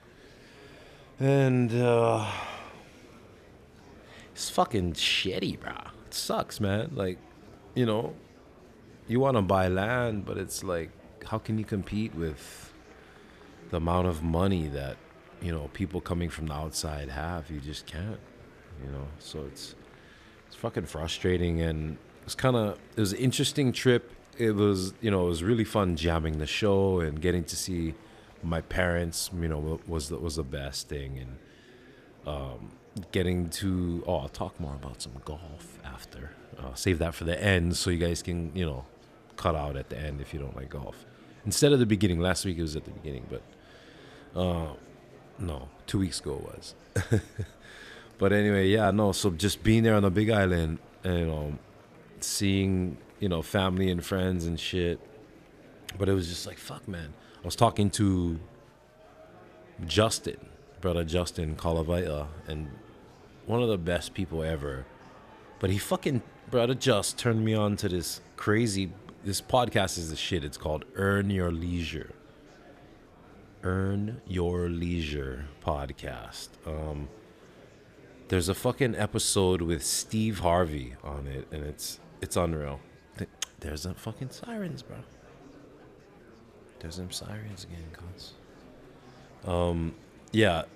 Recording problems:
murmuring crowd; faint; throughout; 25 dB below the speech

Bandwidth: 14.5 kHz